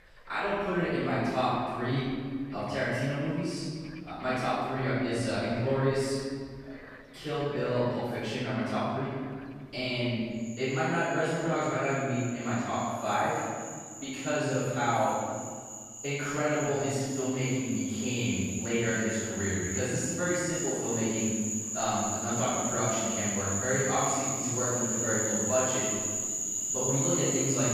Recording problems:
room echo; strong; dies away in 1.8 s
off-mic speech; far
animal sounds; loud; throughout; 2 dB below the speech

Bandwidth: 14.5 kHz